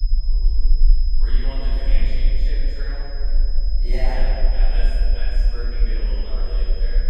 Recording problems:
room echo; strong; dies away in 2.5 s
off-mic speech; far
high-pitched whine; loud; throughout; 5 kHz, 6 dB below the speech
low rumble; noticeable; throughout; 15 dB below the speech

